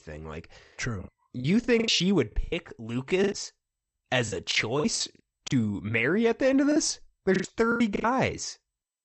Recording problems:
garbled, watery; slightly; nothing above 8 kHz
choppy; very; 14% of the speech affected

